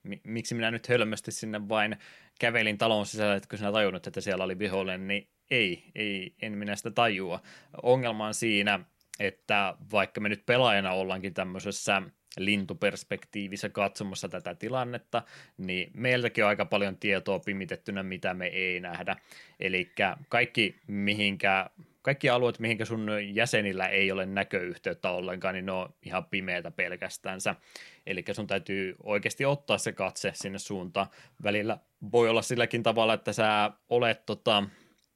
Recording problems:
none

